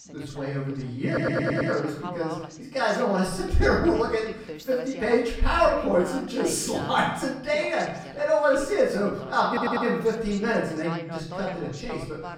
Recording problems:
off-mic speech; far
echo of what is said; noticeable; throughout; 110 ms later, 15 dB below the speech
room echo; noticeable; dies away in 0.6 s
voice in the background; noticeable; throughout; 15 dB below the speech
audio stuttering; at 1 s and at 9.5 s

